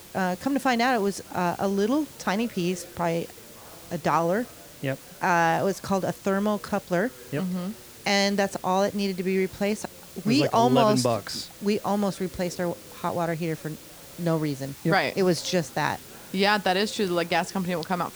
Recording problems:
hiss; noticeable; throughout; 20 dB below the speech
chatter from many people; faint; throughout; 25 dB below the speech

